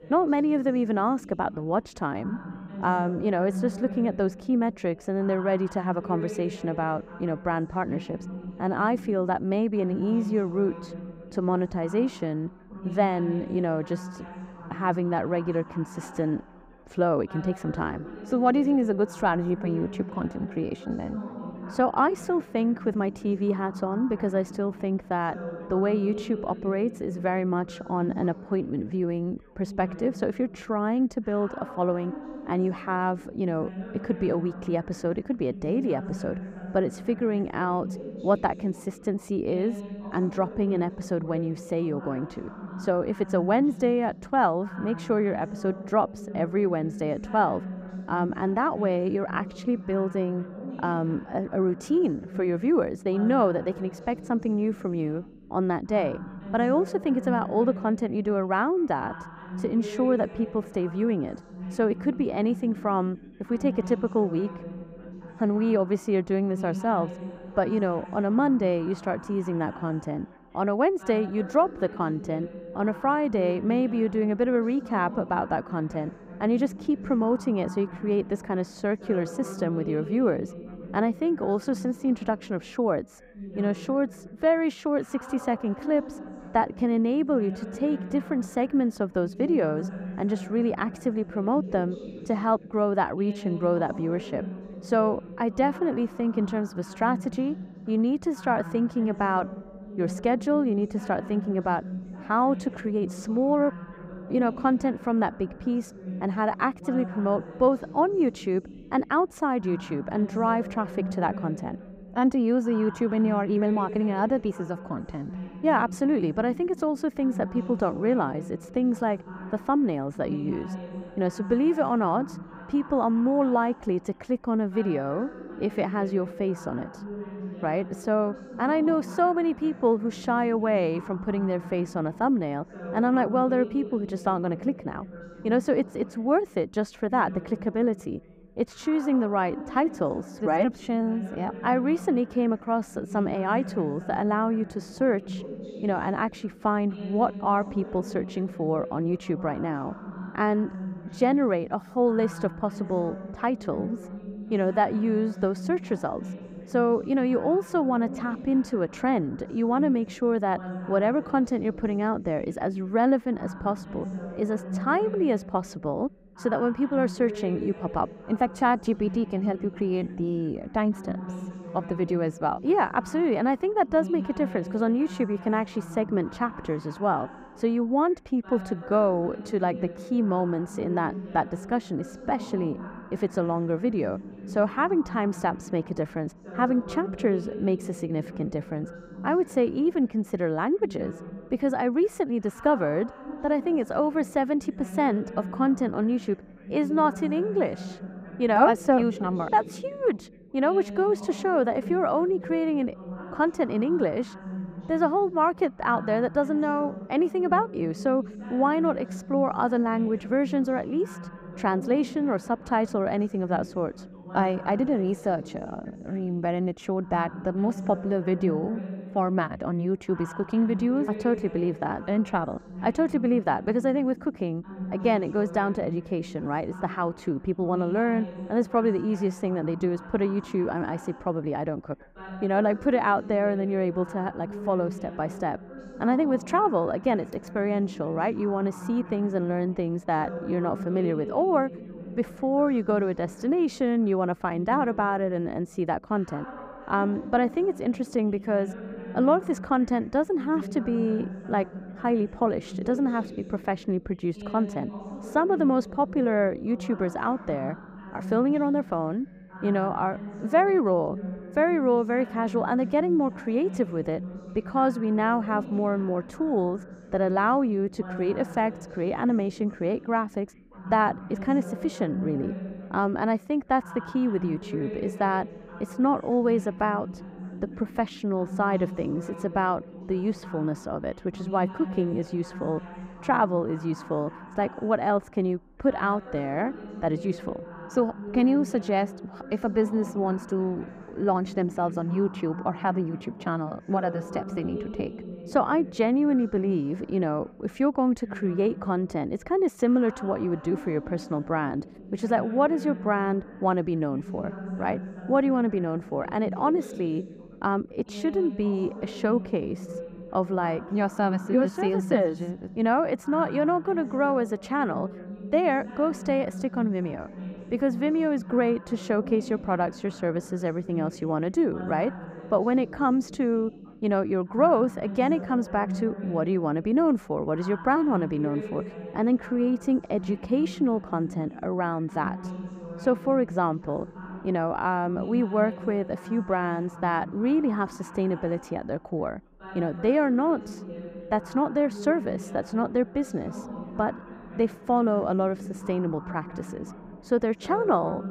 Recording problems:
muffled; slightly; fading above 2 kHz
background chatter; noticeable; throughout; 3 voices, 15 dB below the speech

